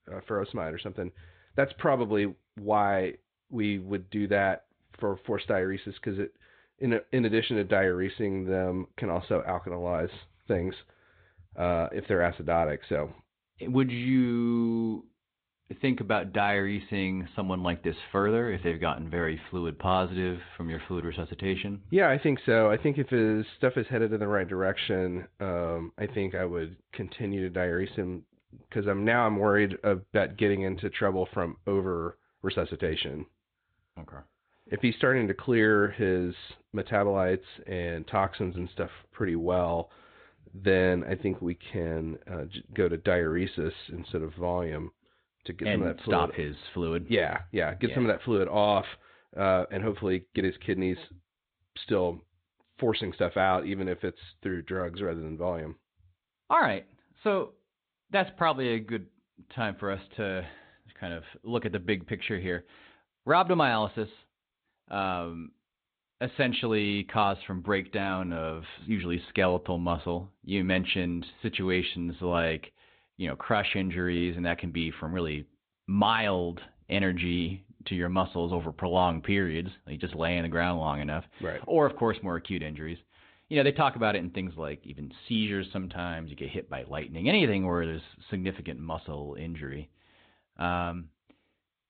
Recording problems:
high frequencies cut off; severe; nothing above 4 kHz
garbled, watery; slightly

